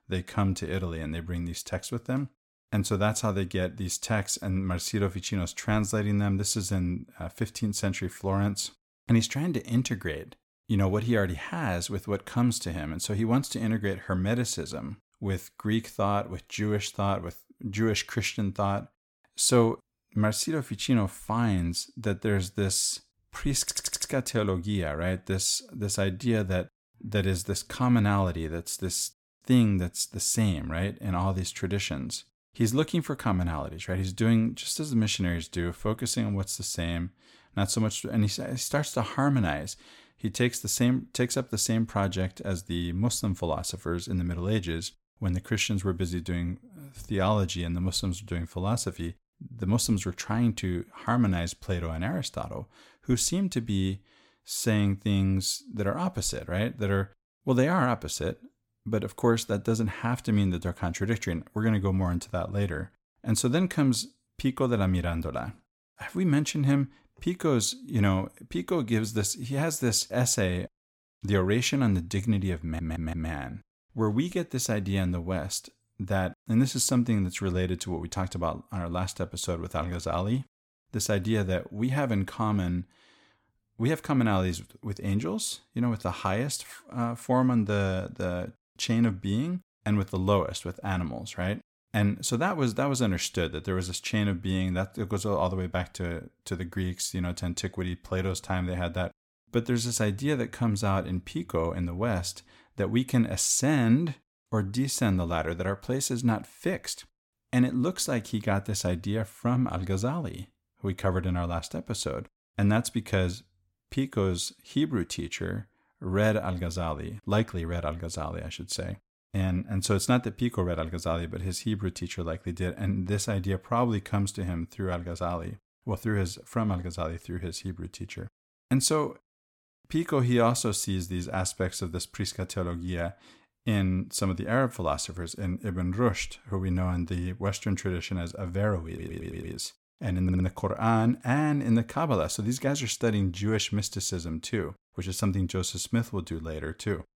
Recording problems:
audio stuttering; 4 times, first at 24 s

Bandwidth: 17 kHz